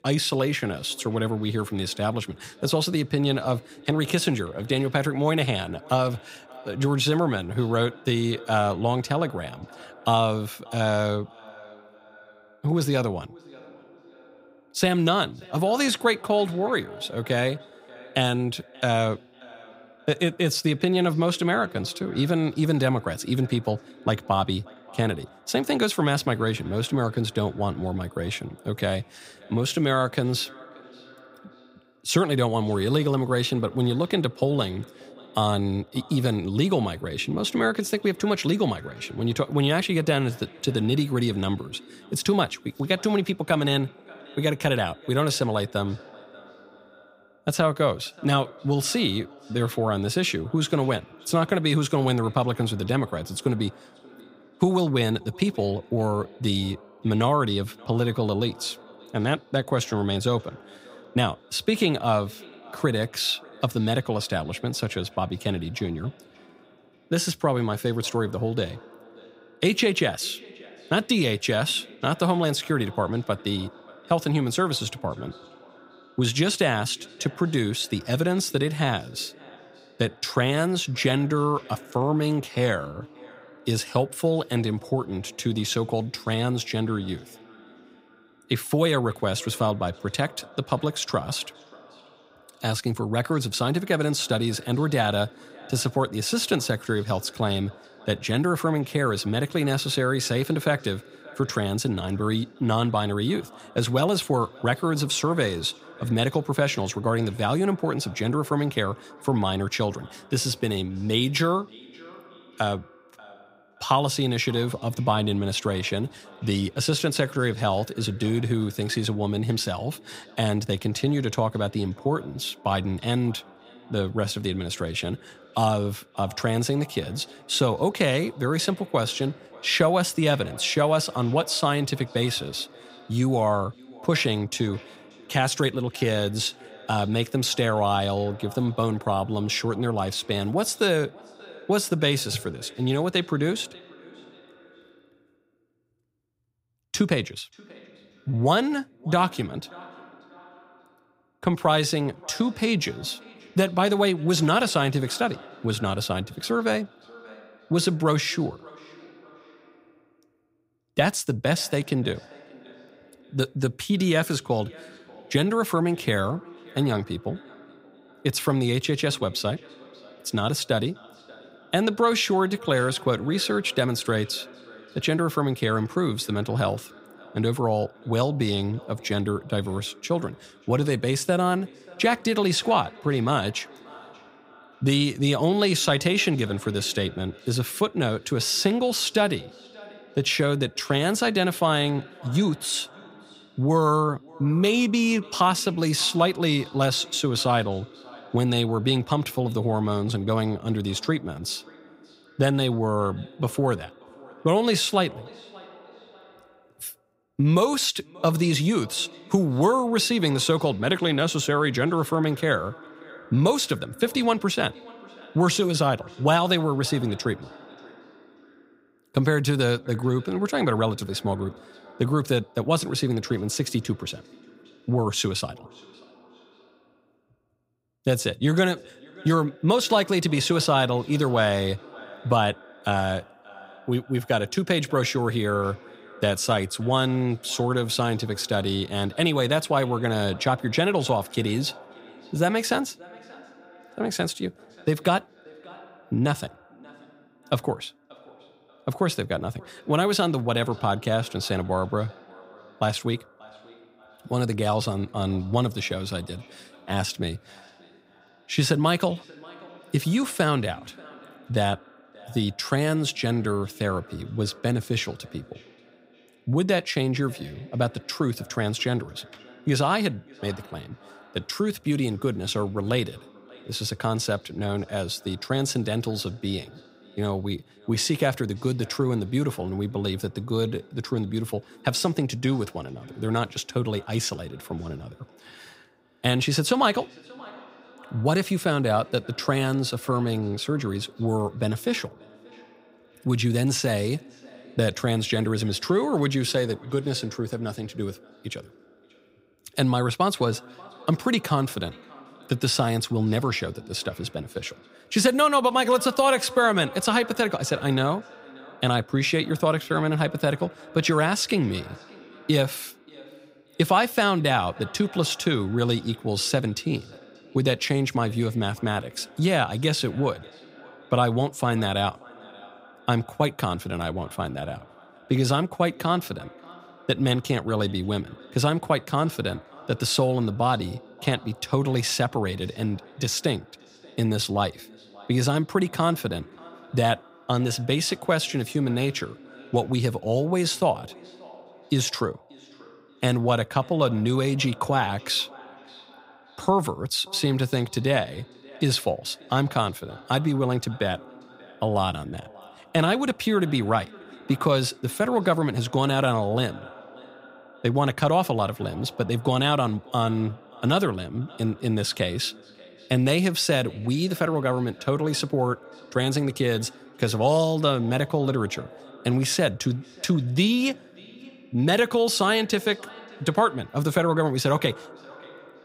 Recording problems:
echo of what is said; faint; throughout; 580 ms later, 20 dB below the speech

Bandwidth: 15.5 kHz